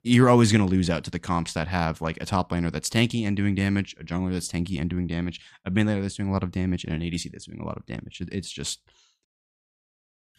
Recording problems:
none

